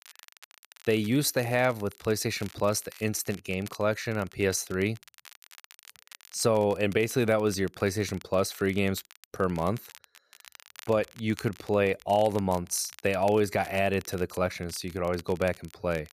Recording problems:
crackle, like an old record; faint; 20 dB below the speech

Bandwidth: 14.5 kHz